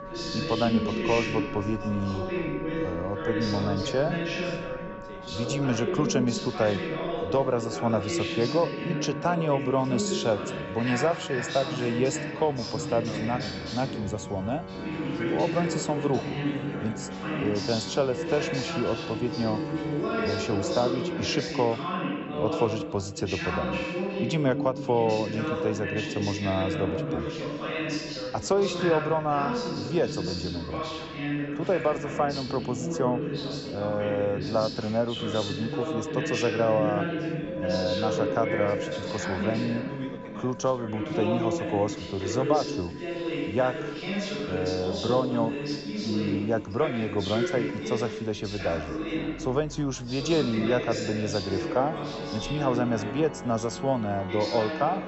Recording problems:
high frequencies cut off; noticeable; nothing above 7.5 kHz
chatter from many people; loud; throughout; 3 dB below the speech
background music; noticeable; throughout; 10 dB below the speech
traffic noise; faint; throughout; 20 dB below the speech

